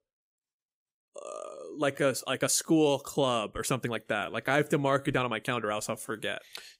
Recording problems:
uneven, jittery; strongly; from 1 to 6 s

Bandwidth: 15.5 kHz